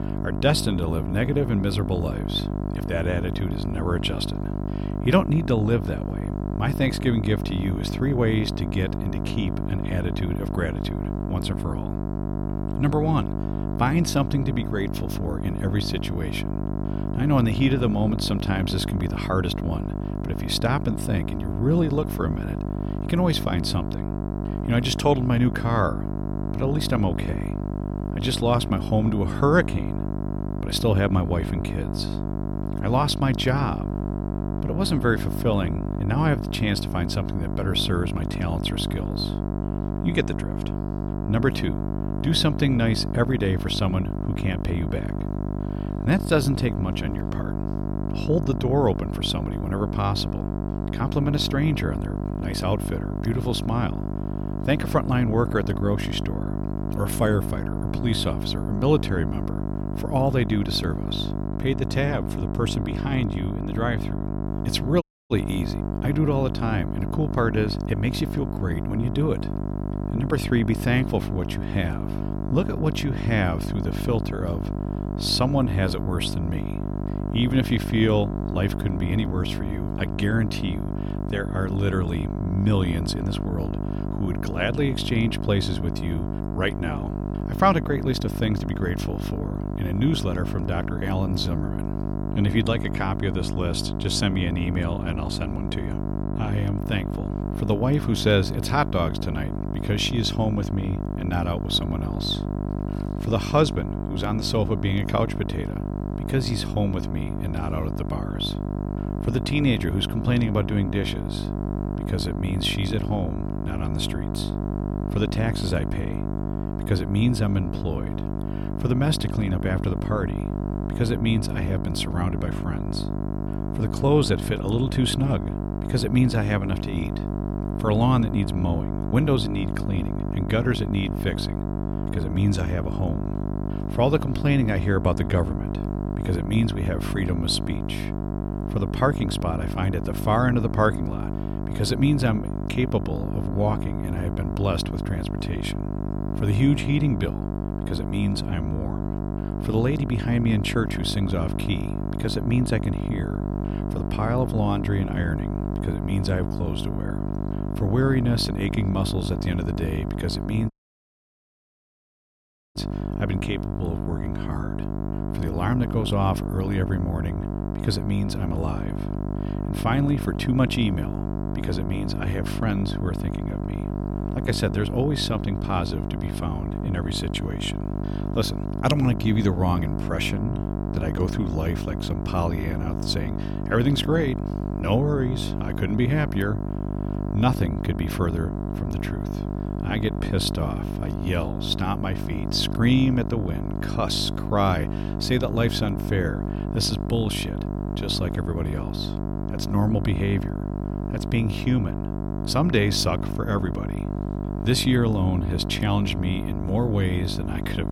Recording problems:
electrical hum; loud; throughout; 50 Hz, 7 dB below the speech
audio cutting out; at 1:05 and at 2:41 for 2 s

